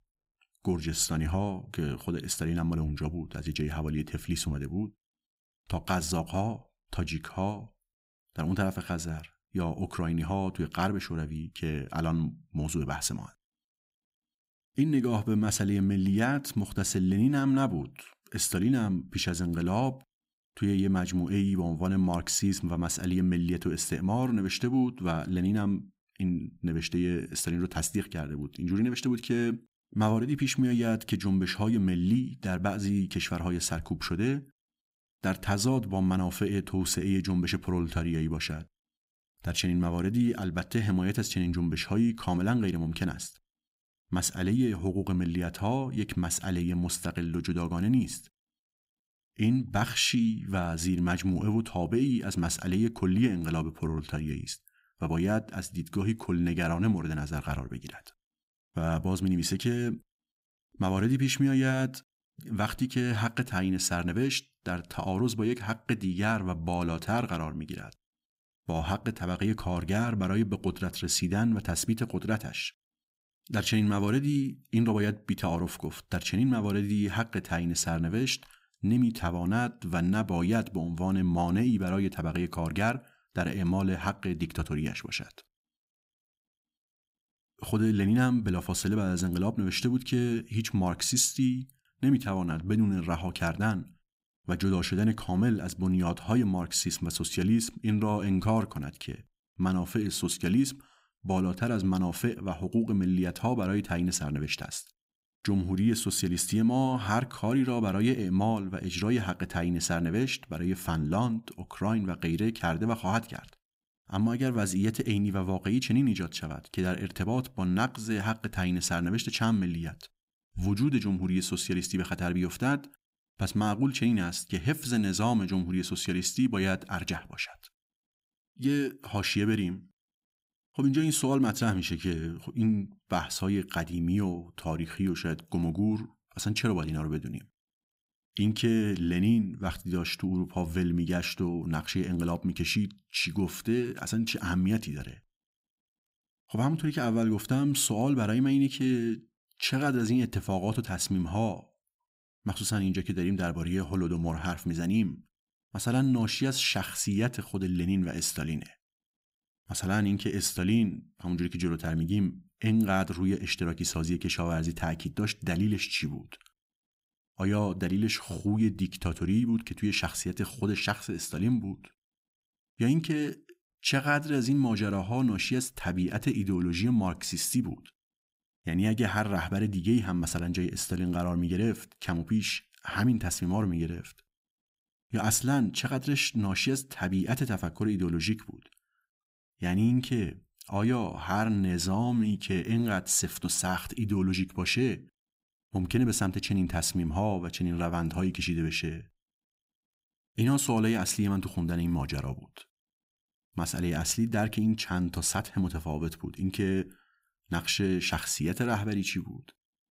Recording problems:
none

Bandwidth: 15.5 kHz